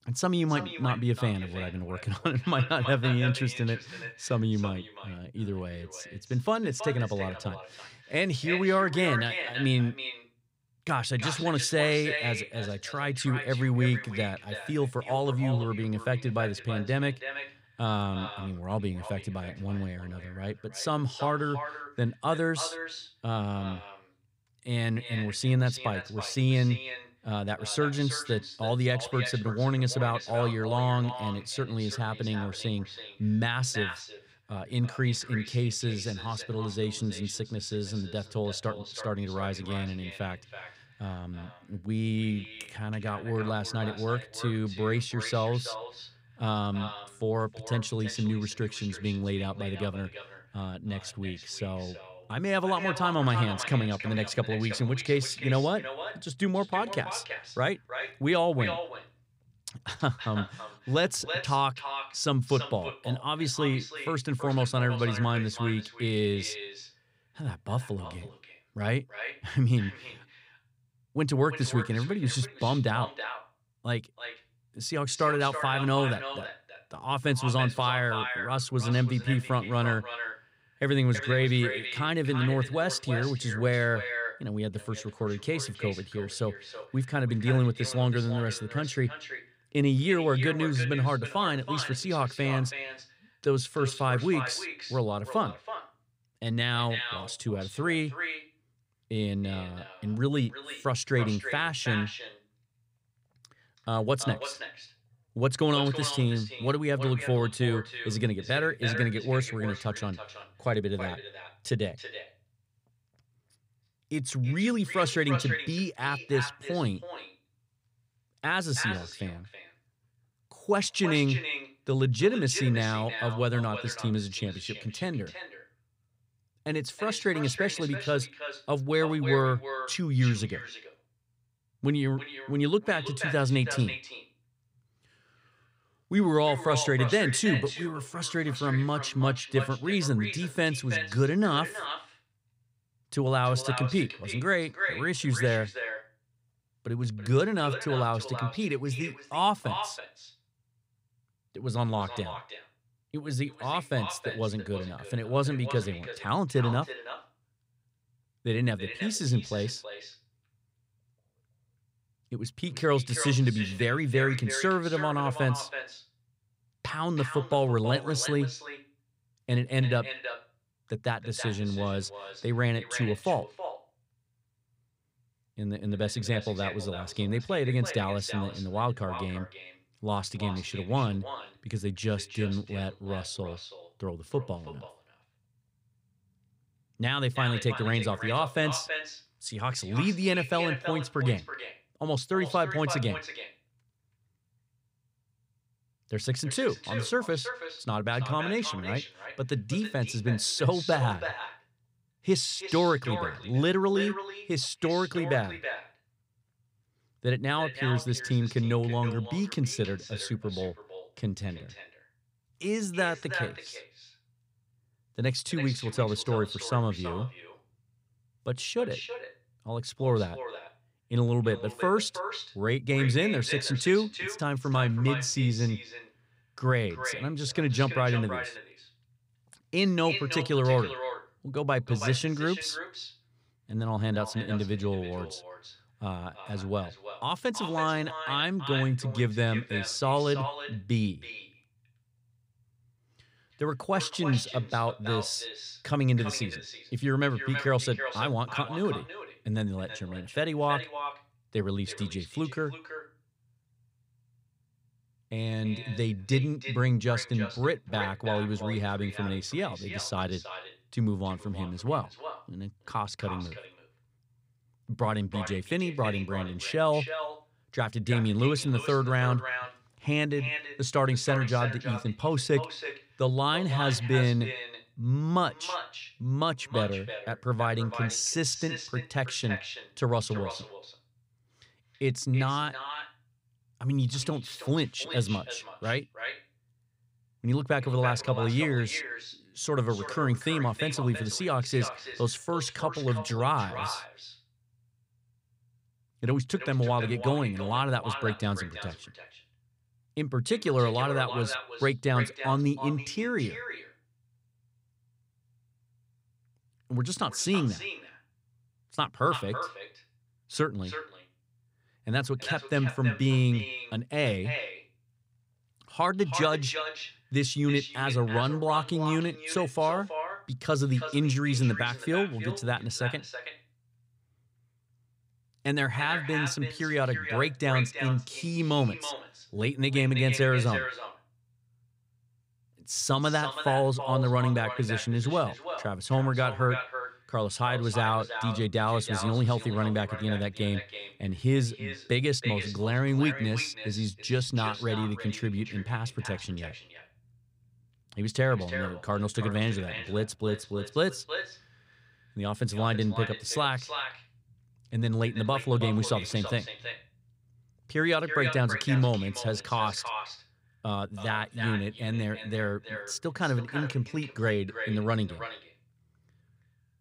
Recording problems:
echo of what is said; strong; throughout; 330 ms later, 9 dB below the speech

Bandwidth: 15.5 kHz